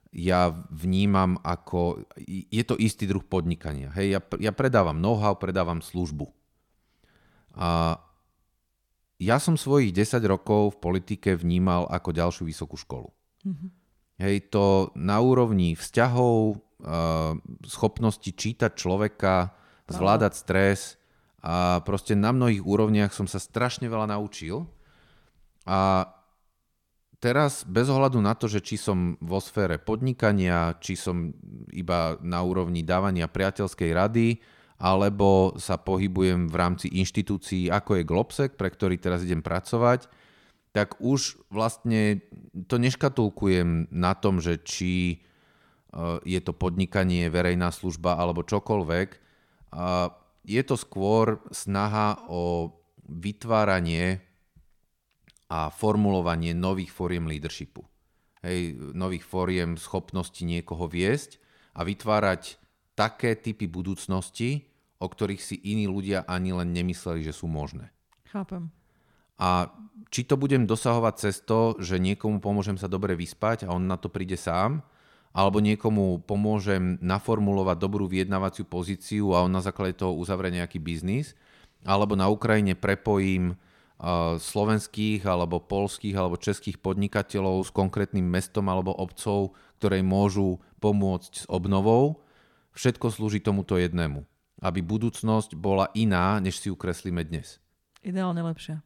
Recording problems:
none

